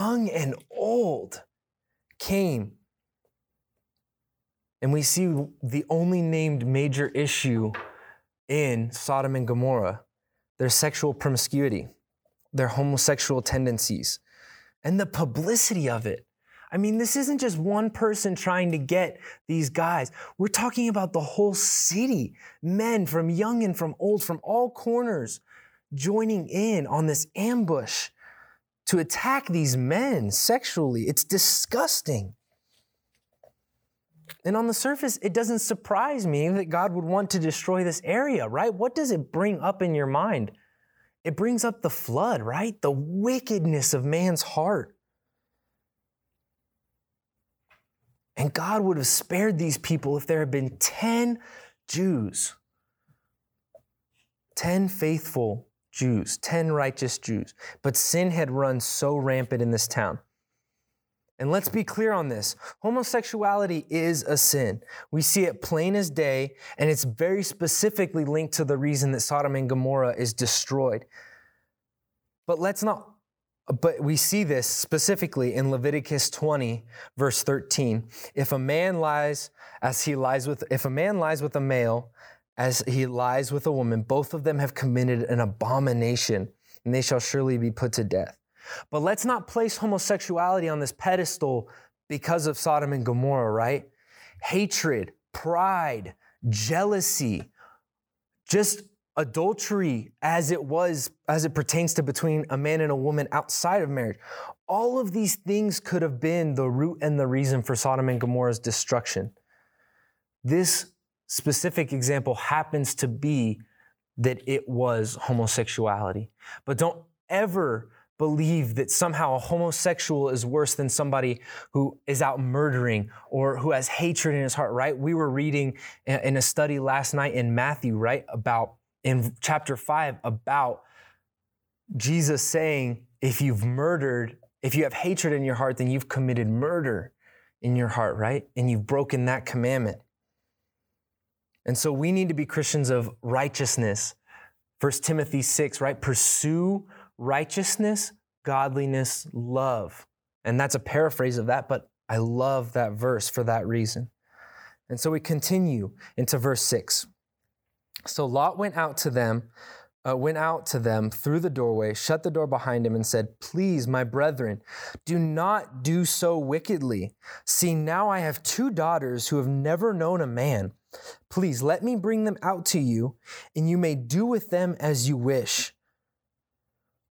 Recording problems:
abrupt cut into speech; at the start

